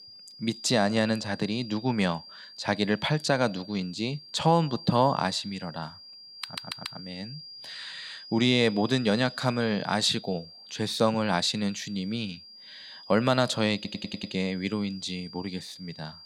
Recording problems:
high-pitched whine; noticeable; throughout; 4.5 kHz, 15 dB below the speech
audio stuttering; at 6.5 s and at 14 s

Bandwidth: 16.5 kHz